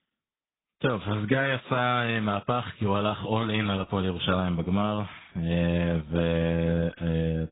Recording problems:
garbled, watery; badly; nothing above 3.5 kHz

